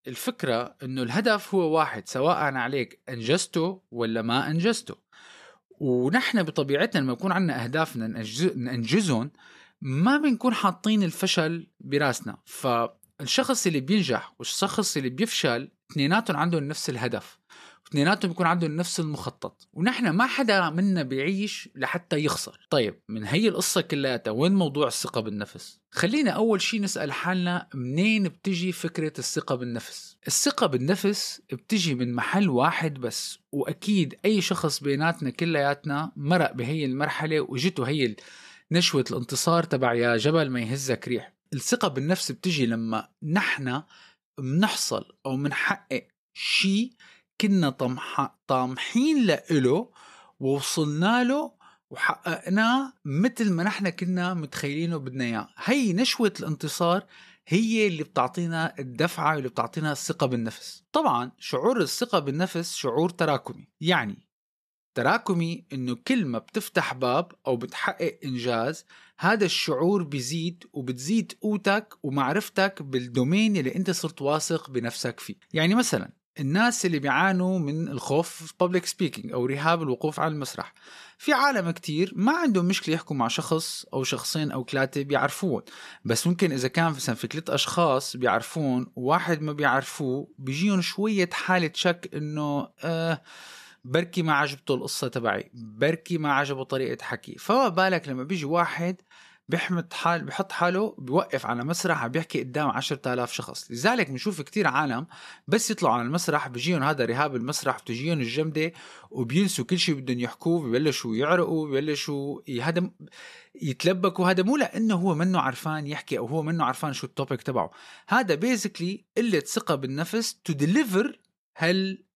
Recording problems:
none

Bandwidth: 13.5 kHz